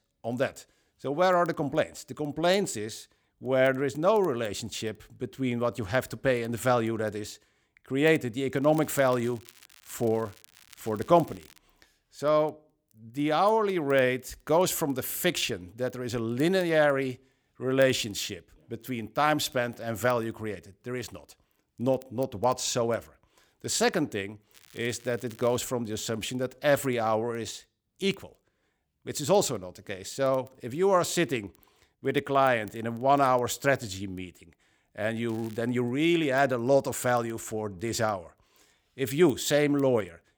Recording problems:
crackling; faint; from 8.5 to 12 s, from 25 to 26 s and at 35 s; 25 dB below the speech

